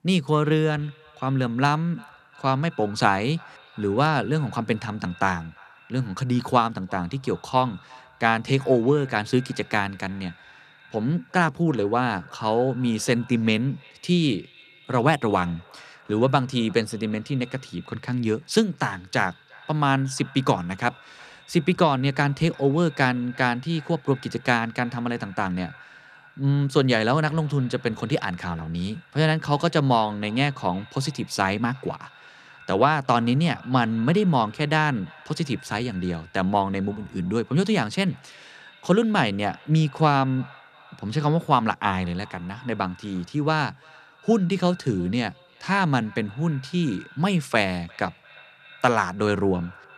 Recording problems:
echo of what is said; faint; throughout; 350 ms later, 25 dB below the speech

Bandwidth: 14.5 kHz